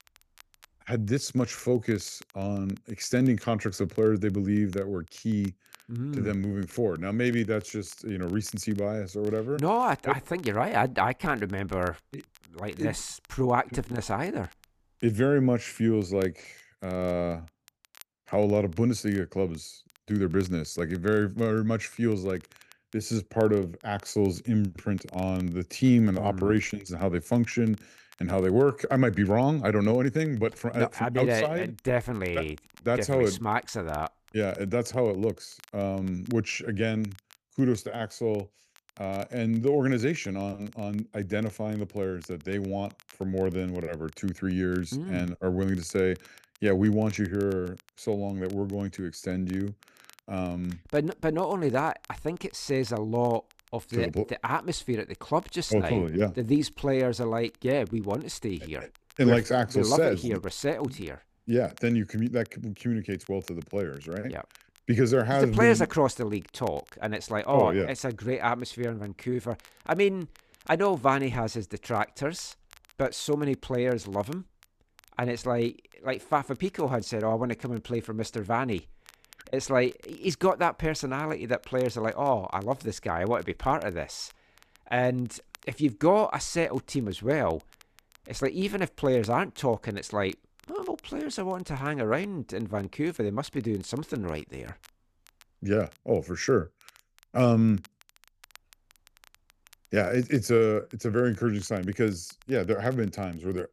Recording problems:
crackle, like an old record; faint; 30 dB below the speech

